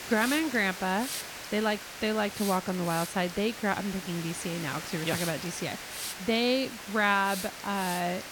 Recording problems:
hiss; loud; throughout; 8 dB below the speech

